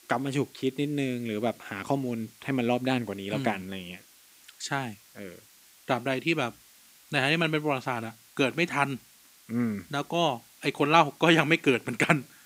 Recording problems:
hiss; faint; throughout; 25 dB below the speech

